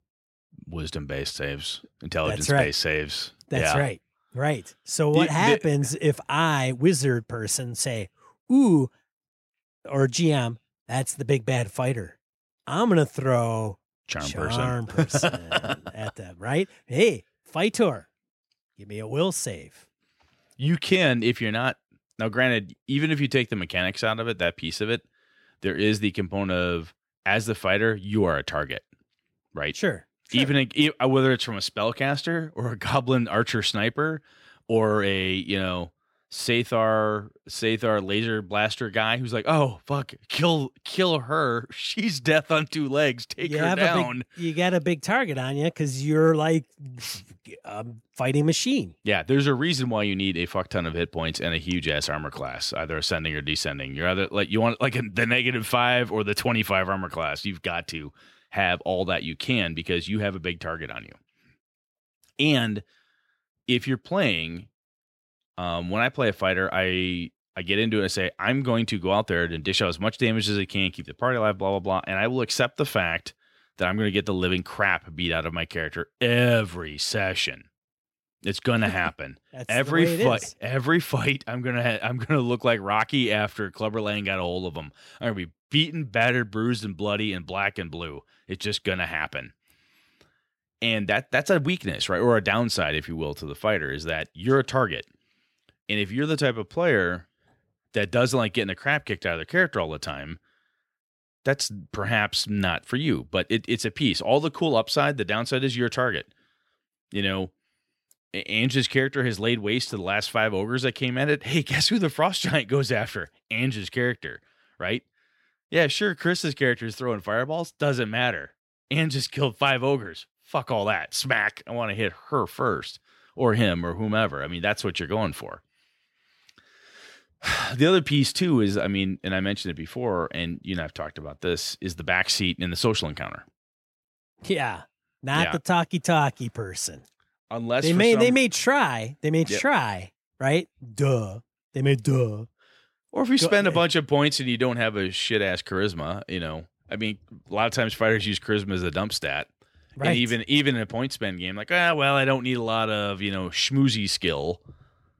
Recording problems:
none

